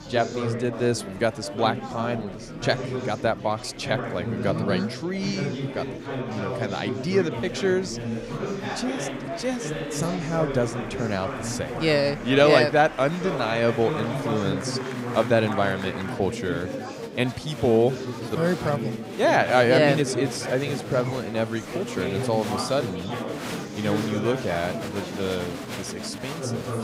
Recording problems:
murmuring crowd; loud; throughout; 6 dB below the speech

